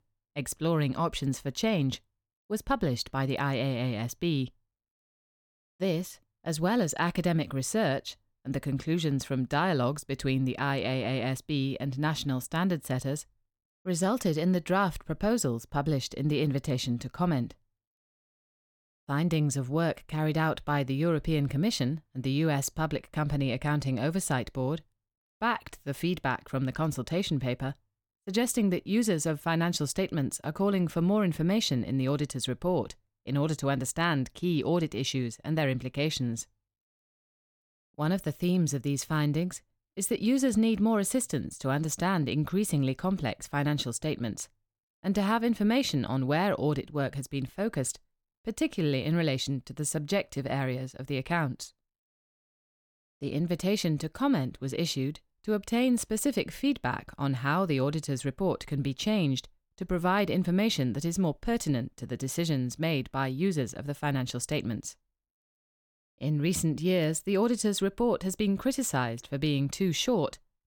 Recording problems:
none

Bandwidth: 17.5 kHz